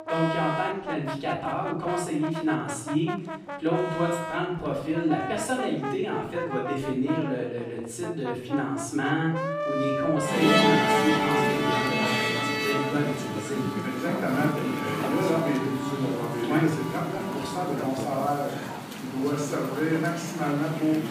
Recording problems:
off-mic speech; far
room echo; noticeable; dies away in 0.7 s
background music; loud; throughout; 1 dB below the speech
murmuring crowd; faint; throughout; 30 dB below the speech

